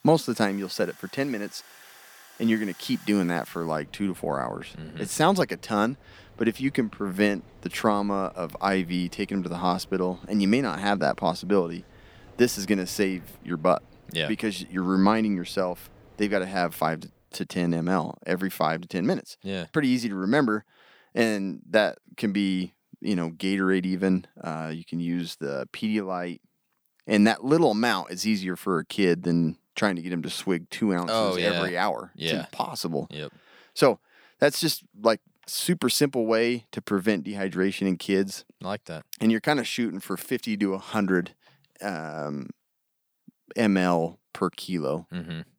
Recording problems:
machinery noise; faint; until 17 s; 25 dB below the speech

